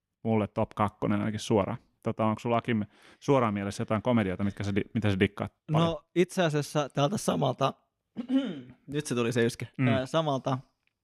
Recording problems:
none

